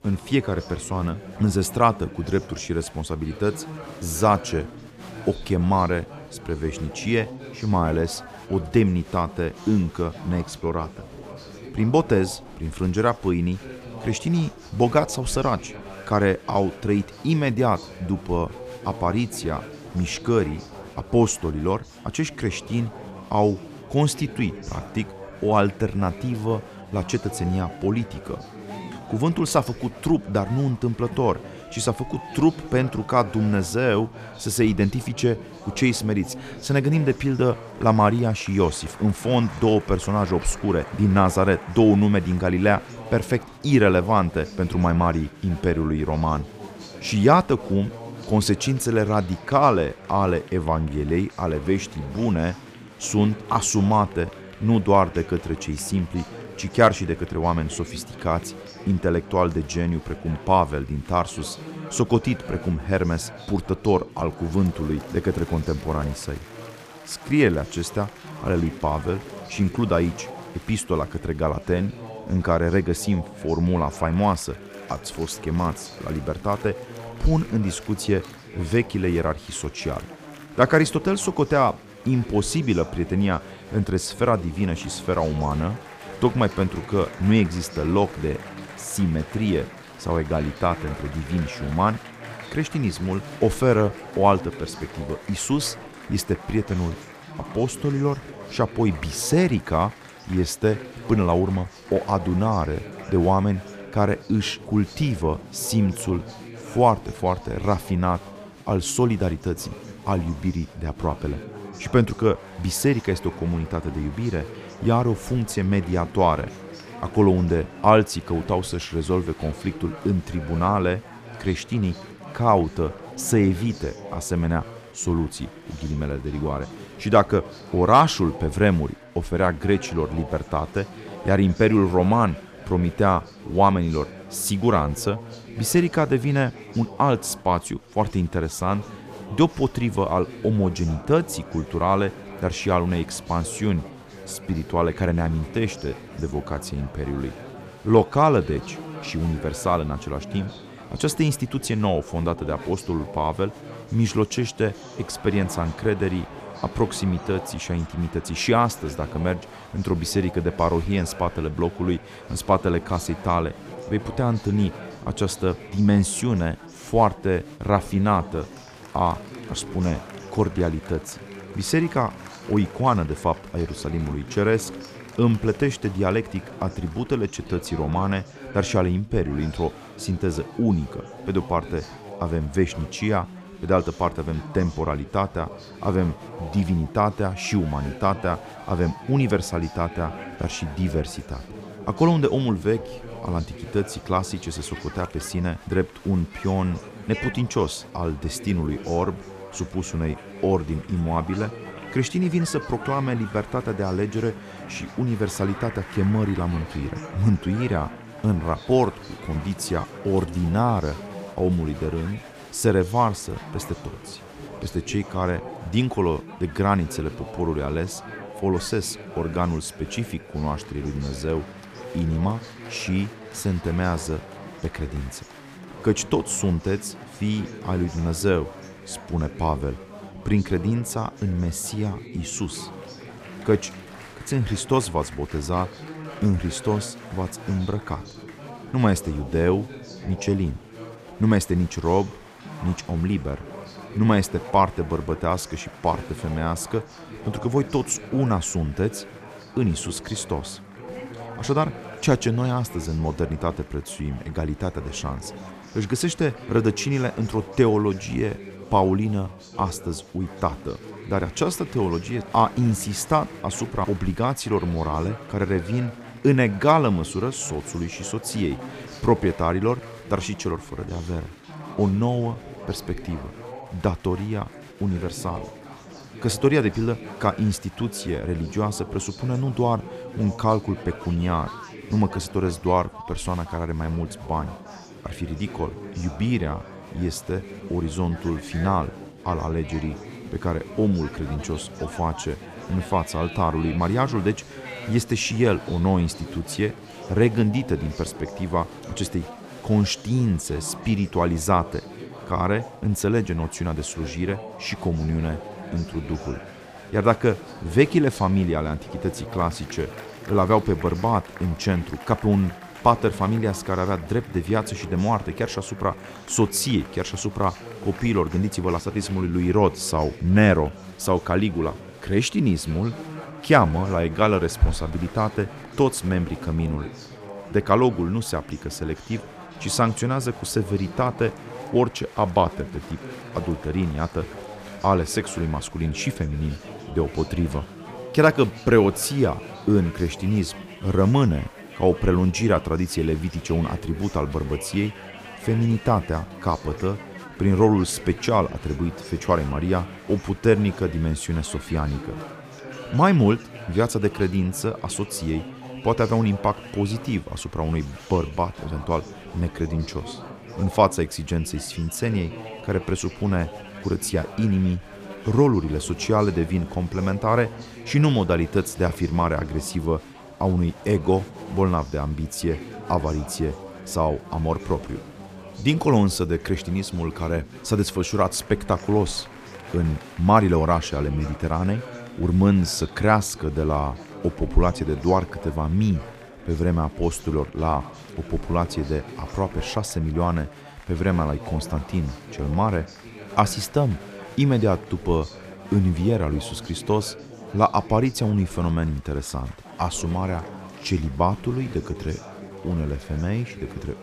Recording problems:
chatter from many people; noticeable; throughout; 15 dB below the speech

